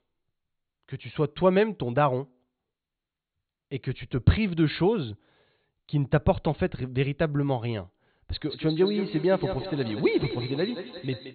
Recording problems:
echo of what is said; strong; from 8.5 s on; 170 ms later, 9 dB below the speech
high frequencies cut off; severe; nothing above 4.5 kHz

